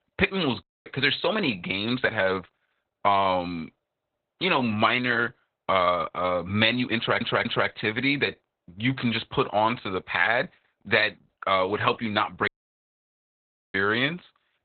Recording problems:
garbled, watery; badly; nothing above 4 kHz
audio cutting out; at 0.5 s and at 12 s for 1.5 s
audio stuttering; at 7 s

